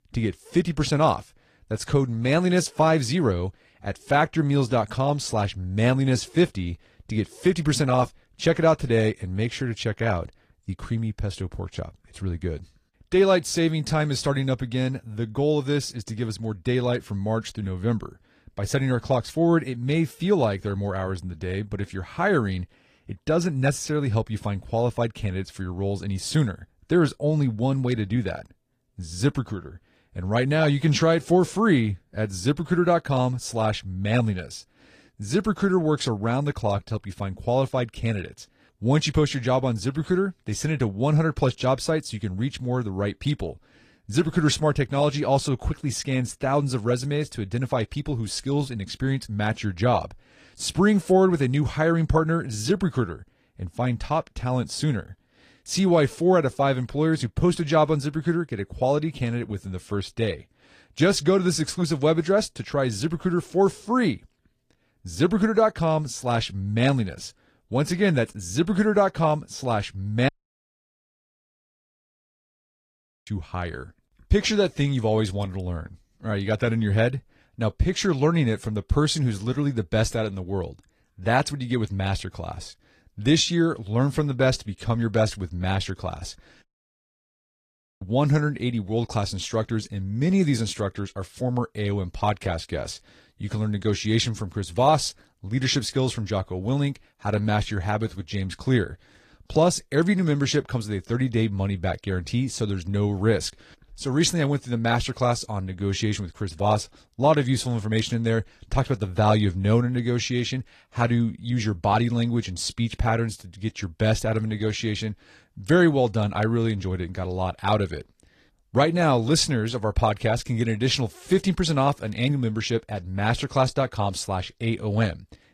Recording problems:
garbled, watery; slightly; nothing above 15 kHz
audio cutting out; at 1:10 for 3 s and at 1:27 for 1.5 s

